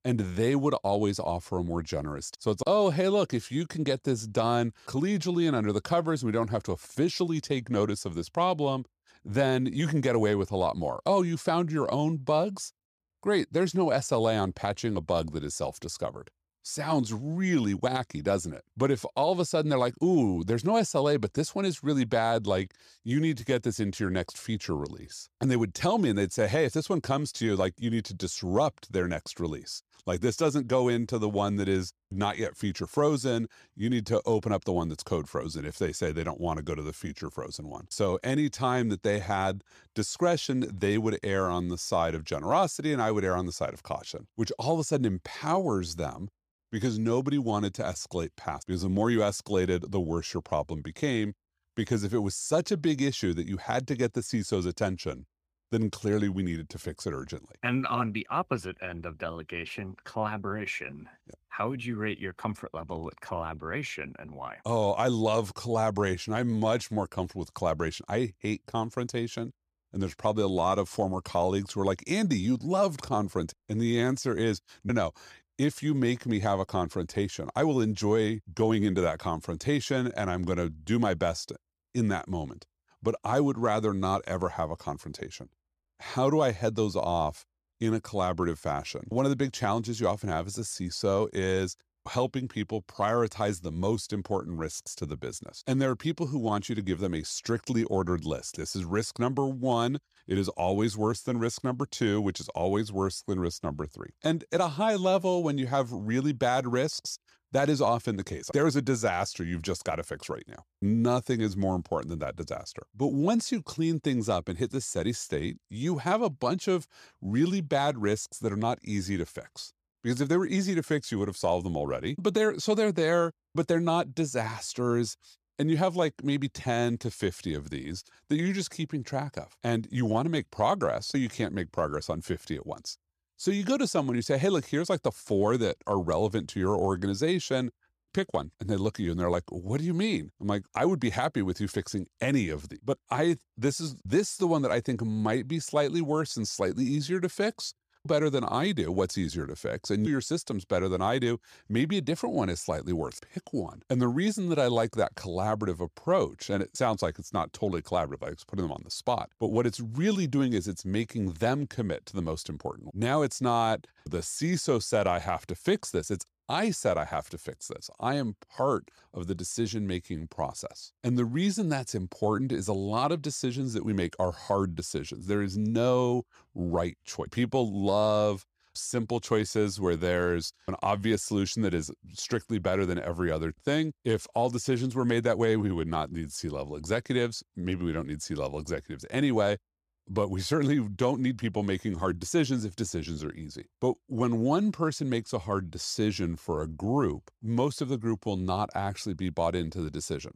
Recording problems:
none

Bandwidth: 14.5 kHz